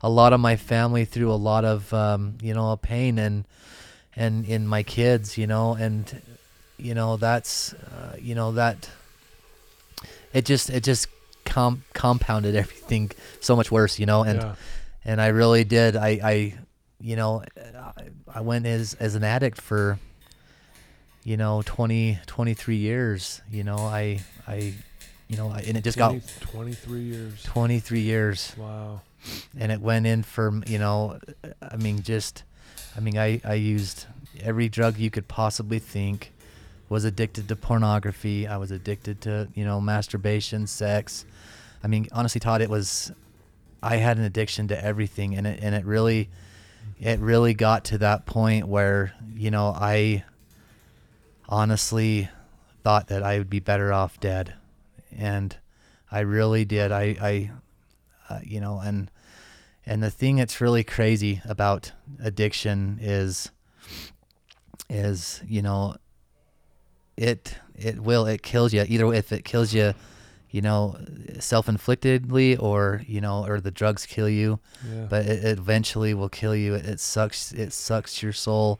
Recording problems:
household noises; faint; throughout; 25 dB below the speech
uneven, jittery; strongly; from 13 s to 1:12

